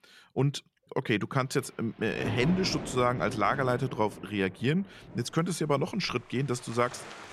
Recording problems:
rain or running water; noticeable; throughout; 10 dB below the speech

